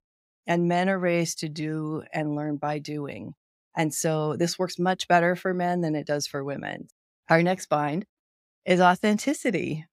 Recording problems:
none

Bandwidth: 15.5 kHz